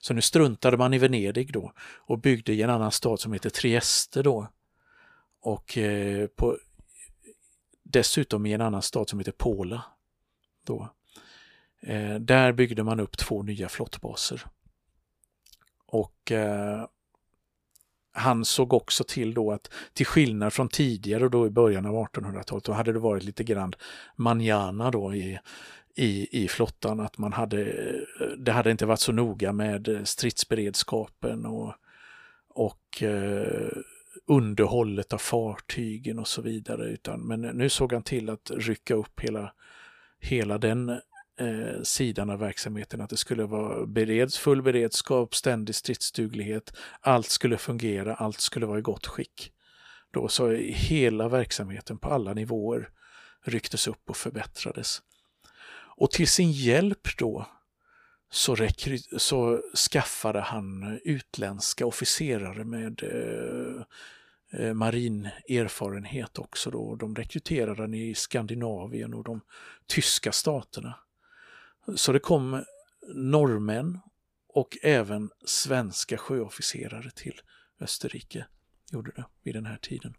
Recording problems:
none

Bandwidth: 15 kHz